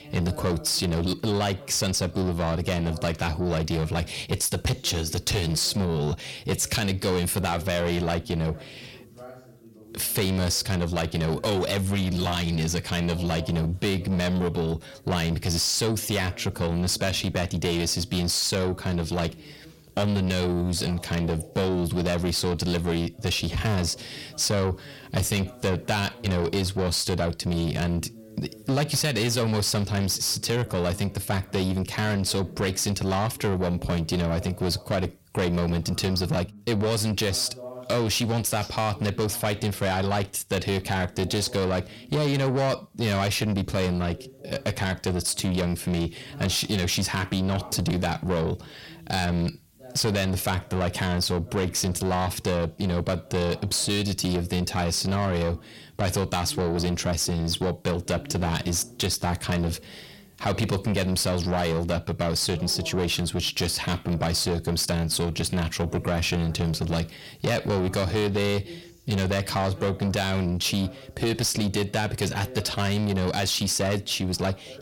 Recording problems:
distortion; heavy; 7 dB below the speech
voice in the background; faint; throughout; 20 dB below the speech

